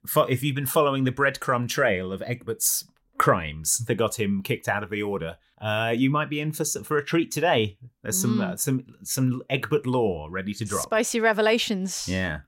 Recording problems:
none

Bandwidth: 16 kHz